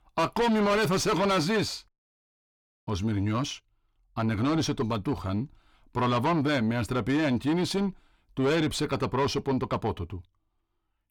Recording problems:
distortion; heavy; 7 dB below the speech

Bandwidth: 18.5 kHz